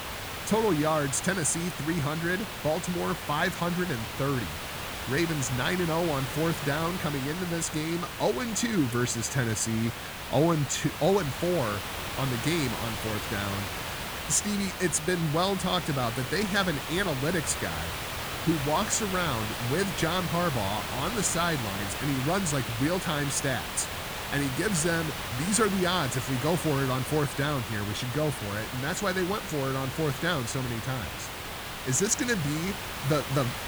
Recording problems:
hiss; loud; throughout; 5 dB below the speech

